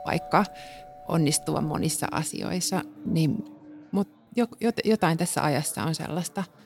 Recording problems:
alarms or sirens; noticeable; until 3.5 s; 15 dB below the speech
chatter from many people; faint; throughout; 30 dB below the speech

